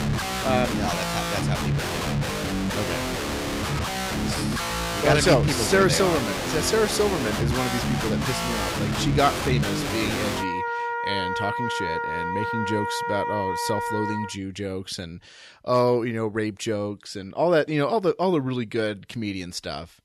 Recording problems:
background music; loud; until 14 s; 1 dB below the speech

